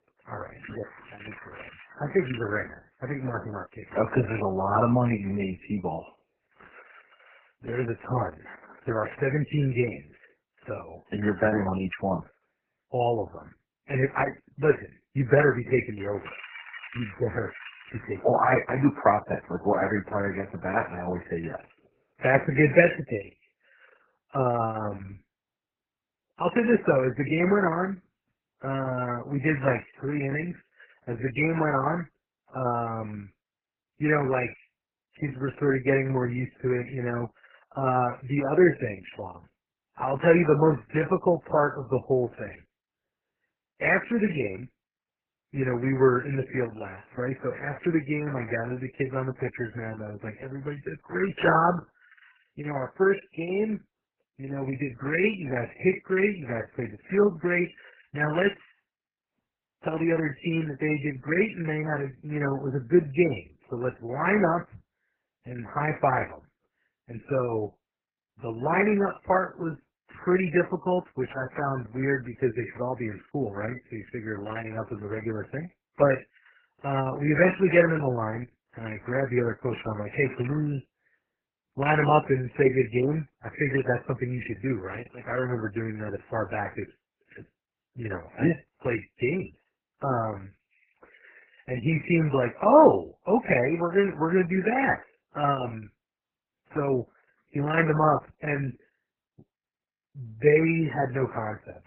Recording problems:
garbled, watery; badly; nothing above 2.5 kHz
crackling; noticeable; from 0.5 to 2.5 s, from 16 to 18 s and at 1:20; 15 dB below the speech

